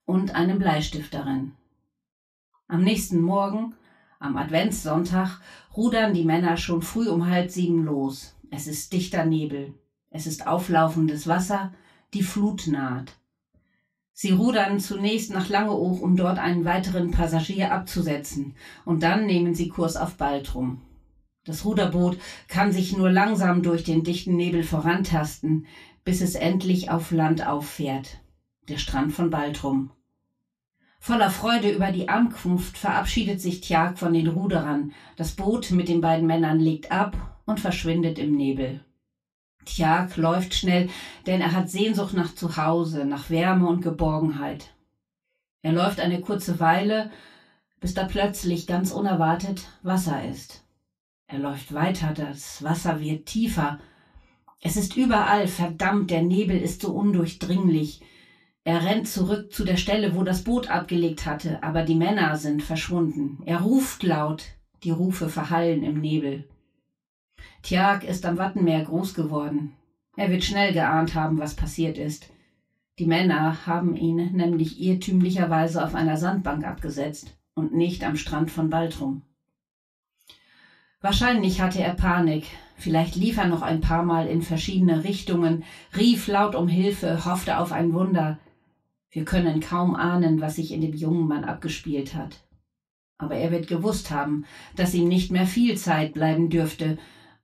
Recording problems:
off-mic speech; far
room echo; slight; dies away in 0.2 s

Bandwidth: 14.5 kHz